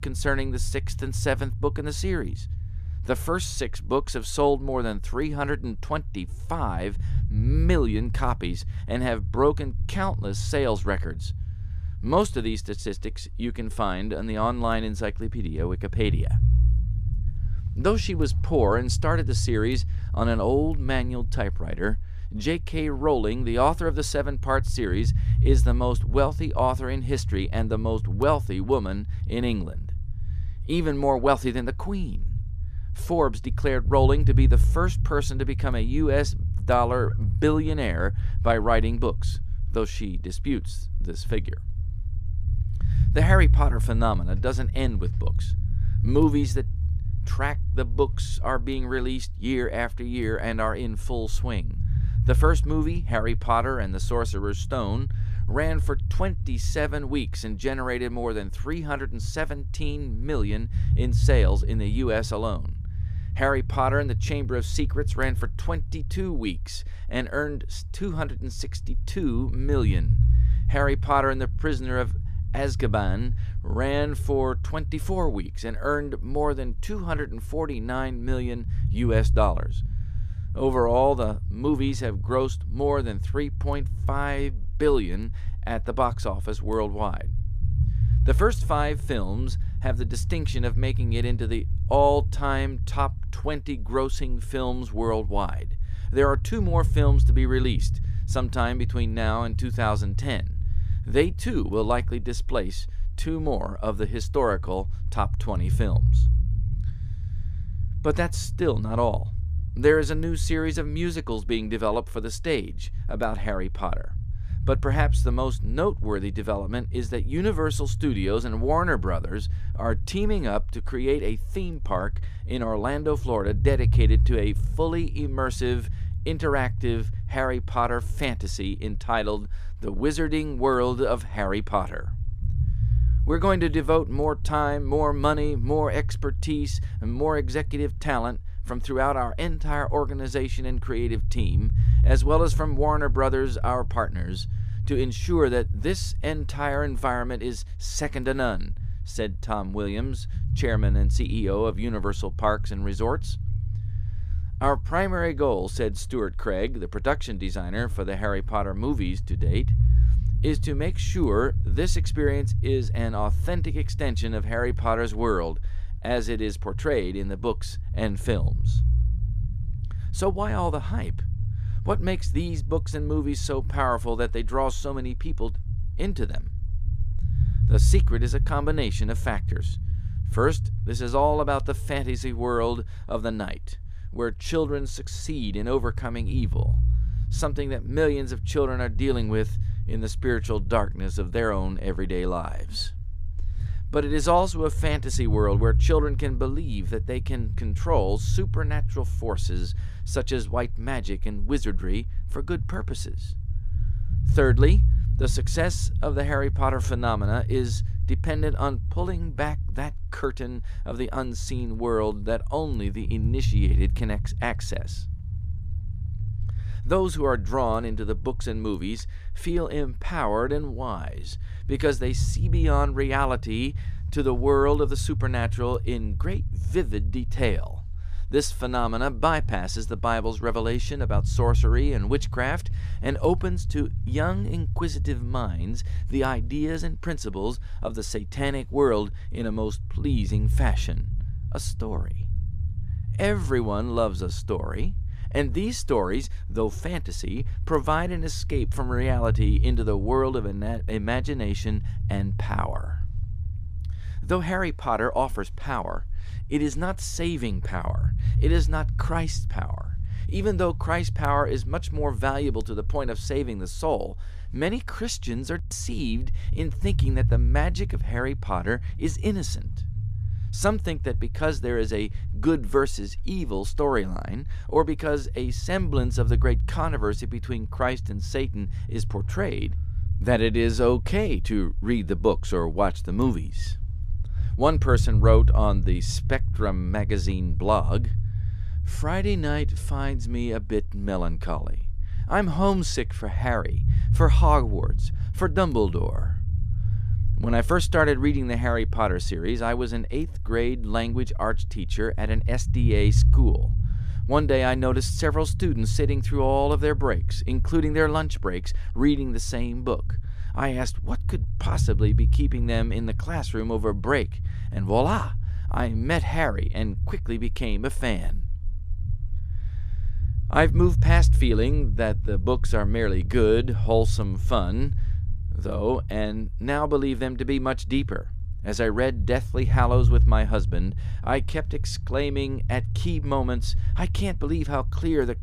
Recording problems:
low rumble; noticeable; throughout; 15 dB below the speech

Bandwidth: 14.5 kHz